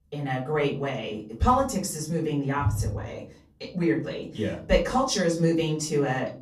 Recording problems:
off-mic speech; far
room echo; slight; dies away in 0.4 s

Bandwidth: 15 kHz